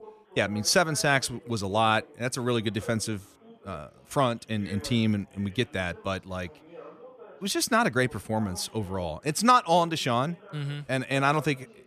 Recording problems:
background chatter; faint; throughout; 3 voices, 20 dB below the speech

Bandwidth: 14.5 kHz